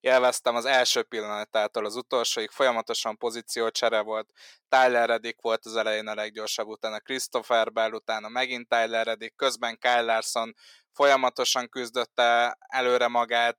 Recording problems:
thin; somewhat; fading below 550 Hz

